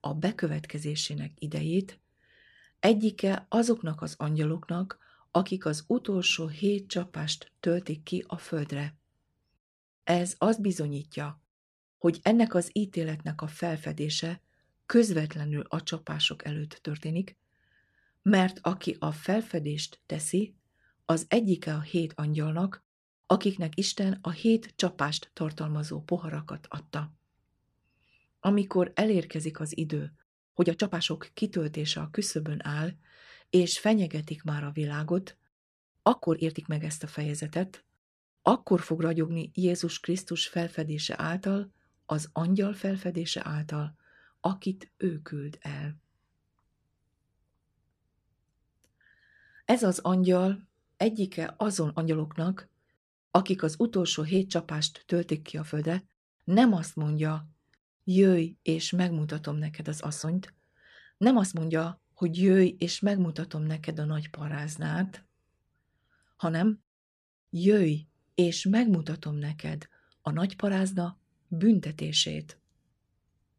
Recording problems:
uneven, jittery; strongly; from 3 s to 1:10

